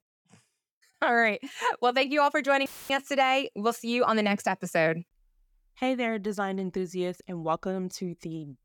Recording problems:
audio cutting out; filled with static; at 2.5 s

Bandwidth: 18 kHz